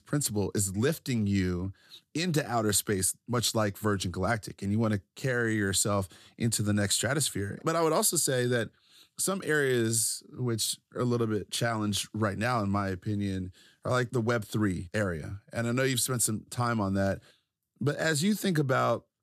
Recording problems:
none

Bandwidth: 14 kHz